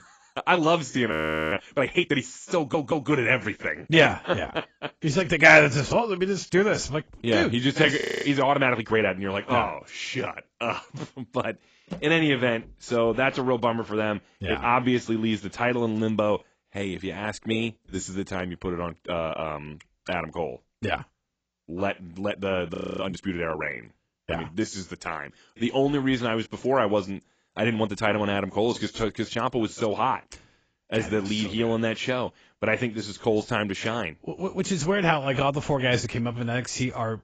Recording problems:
garbled, watery; badly; nothing above 7.5 kHz
audio freezing; at 1 s, at 8 s and at 23 s
audio stuttering; at 2.5 s

